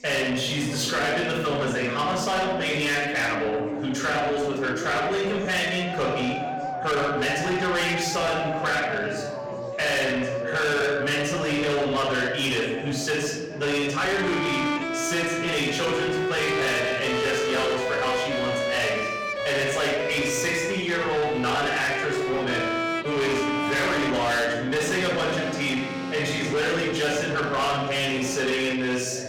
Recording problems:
distortion; heavy; 7 dB below the speech
off-mic speech; far
room echo; noticeable; dies away in 0.8 s
background music; loud; throughout; 5 dB below the speech
chatter from many people; noticeable; throughout; 15 dB below the speech

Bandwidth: 17.5 kHz